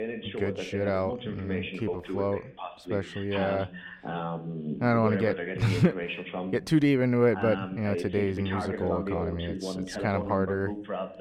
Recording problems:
voice in the background; loud; throughout; 6 dB below the speech

